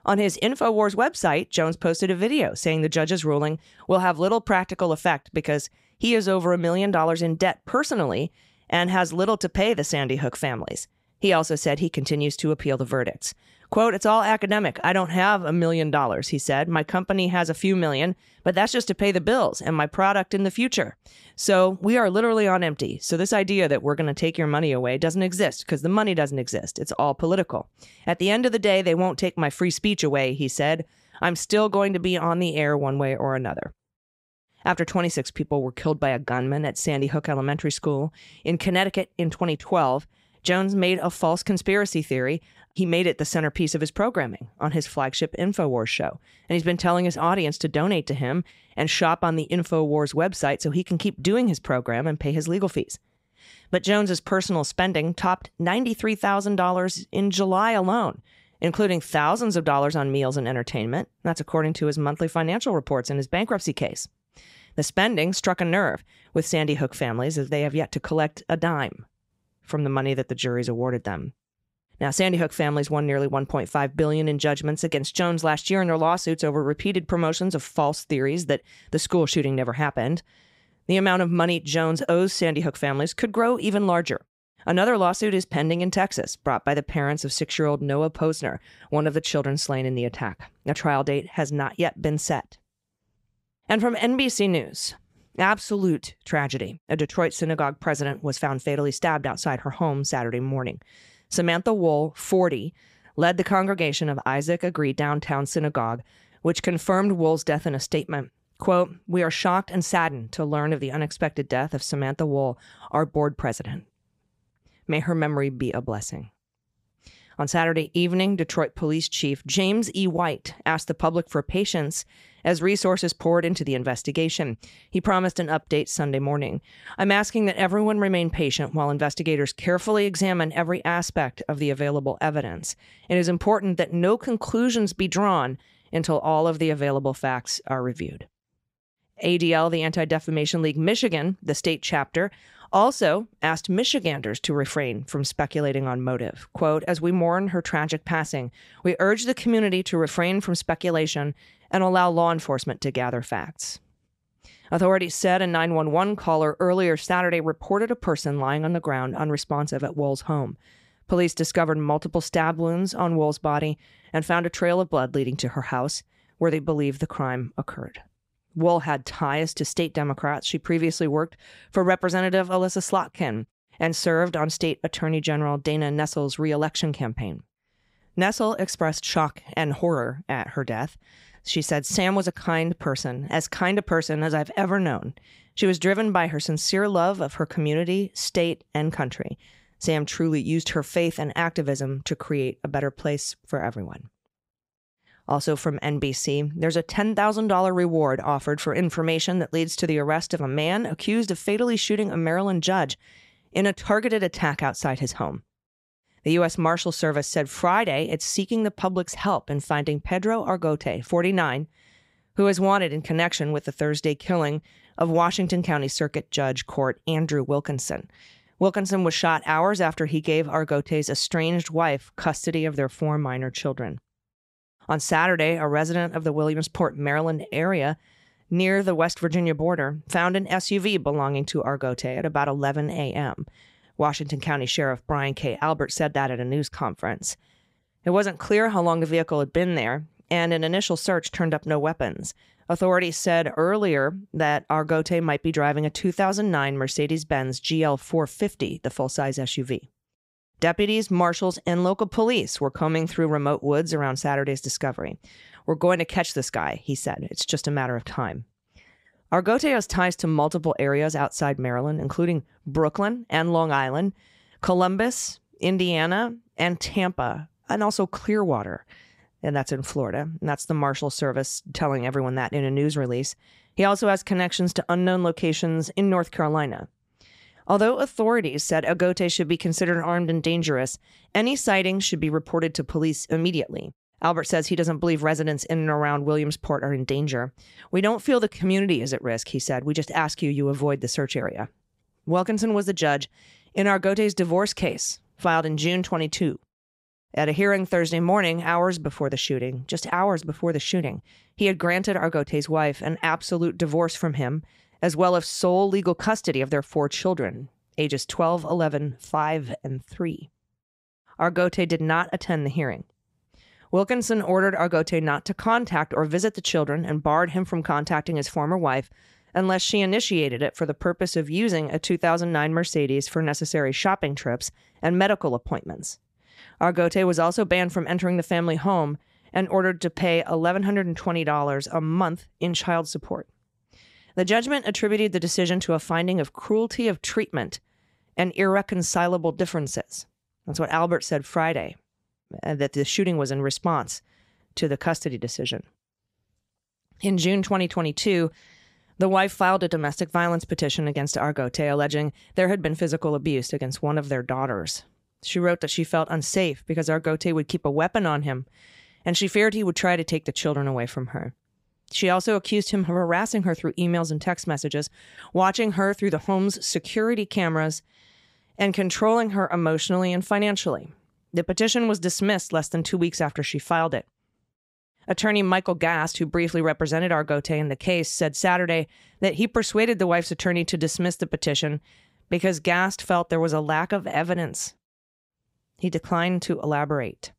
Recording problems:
none

